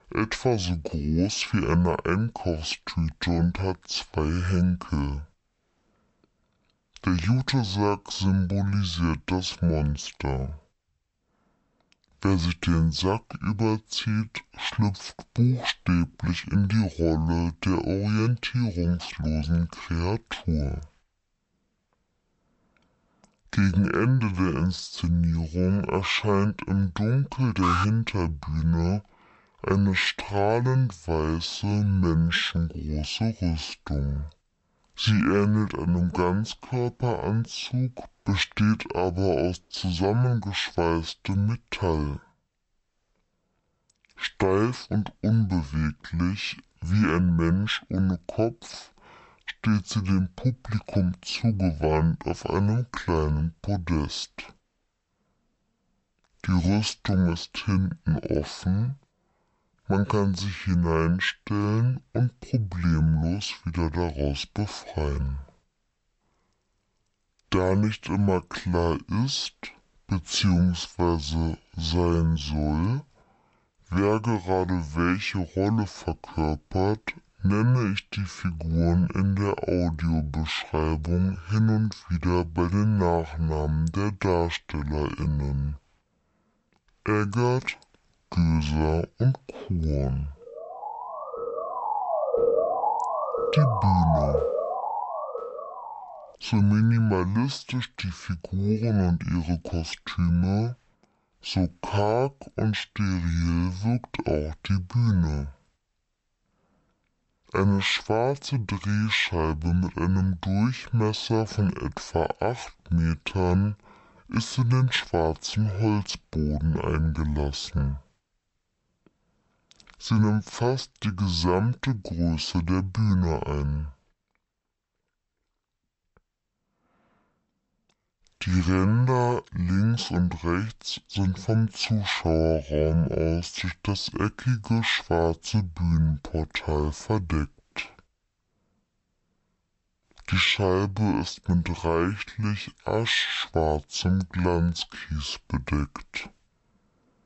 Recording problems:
wrong speed and pitch; too slow and too low; 0.5 times normal speed
alarm; noticeable; at 28 s; peak level with the speech
siren; loud; from 1:31 to 1:36; peak 3 dB above the speech

